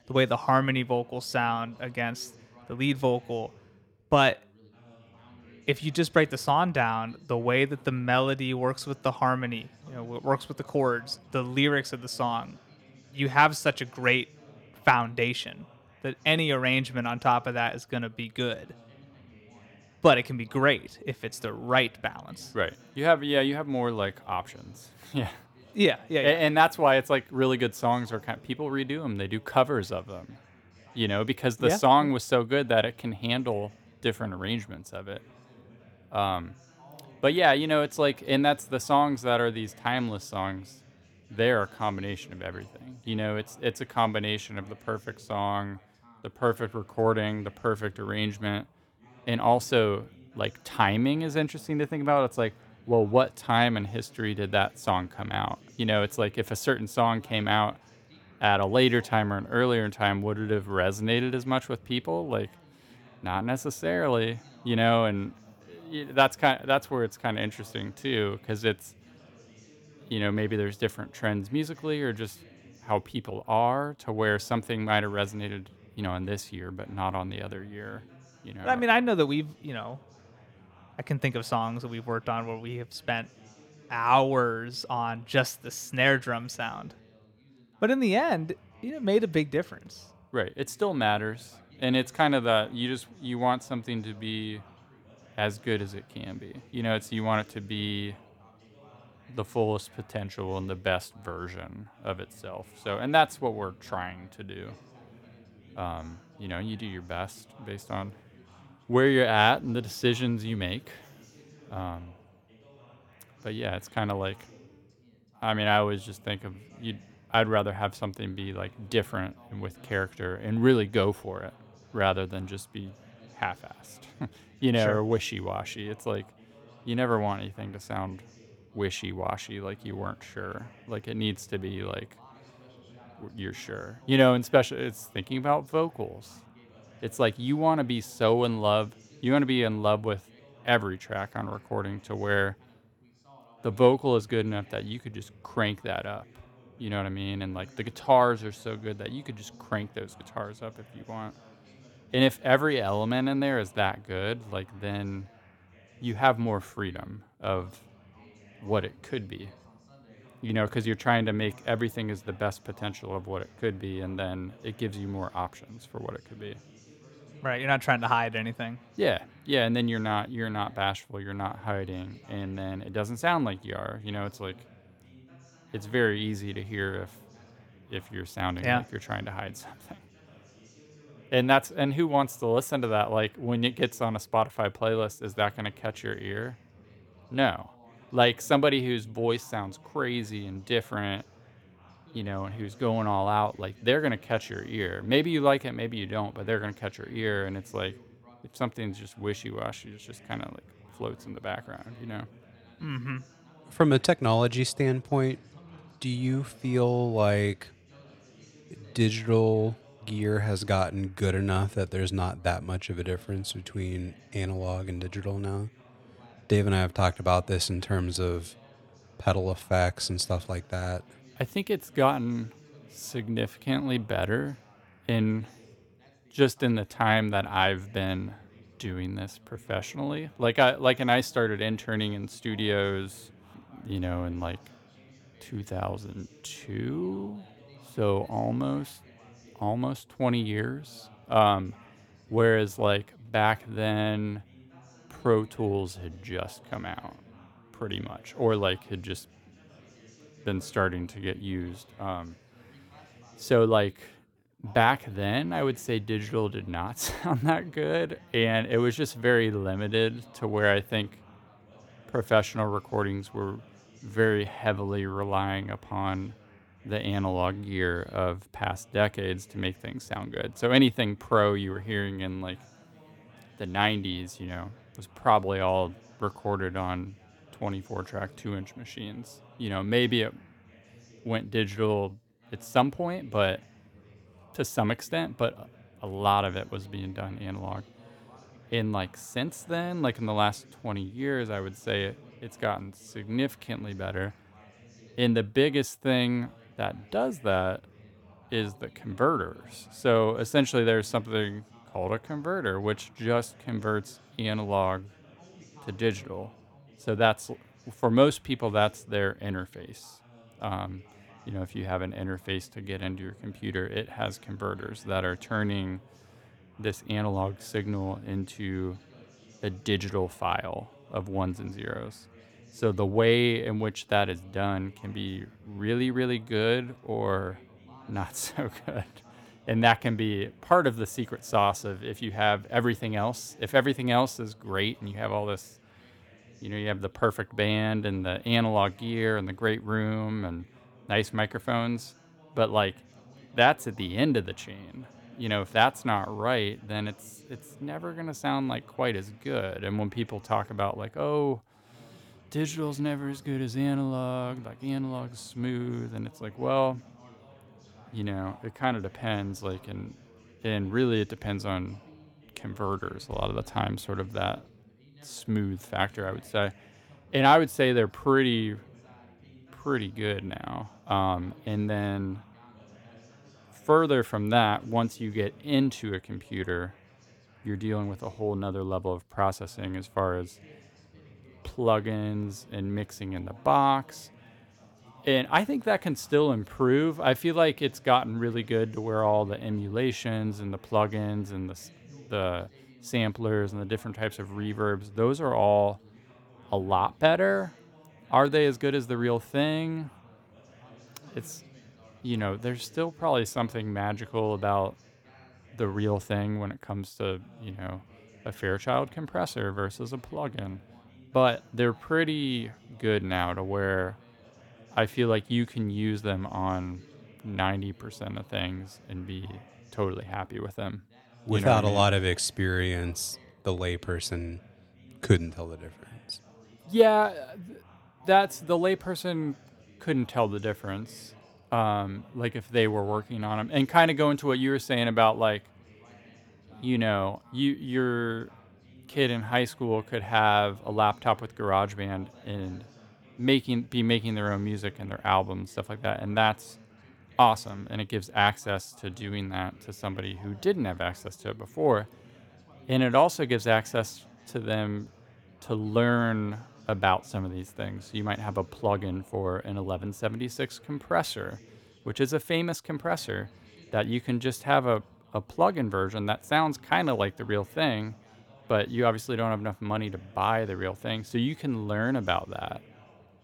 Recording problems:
background chatter; faint; throughout; 2 voices, 25 dB below the speech

